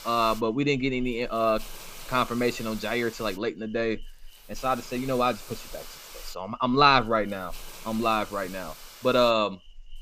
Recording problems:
high frequencies cut off; noticeable; nothing above 8 kHz
hiss; noticeable; throughout; 20 dB below the speech

